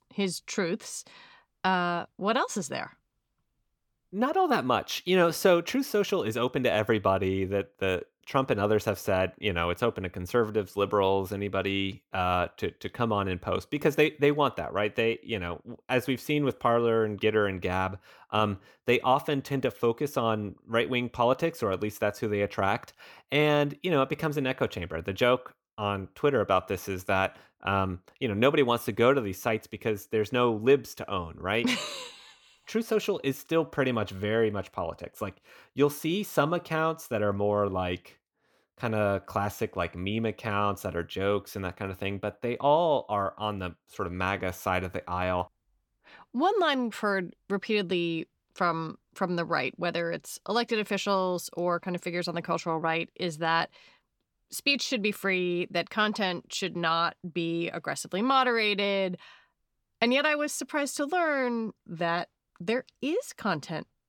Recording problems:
none

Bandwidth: 18 kHz